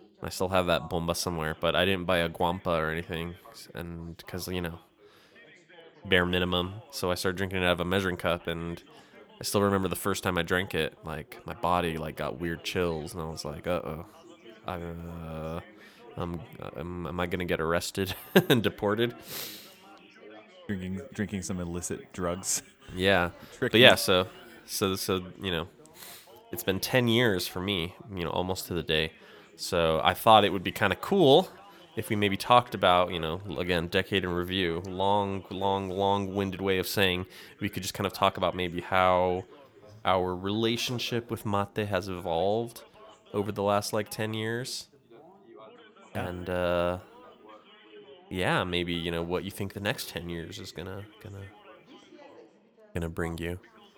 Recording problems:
background chatter; faint; throughout; 3 voices, 25 dB below the speech

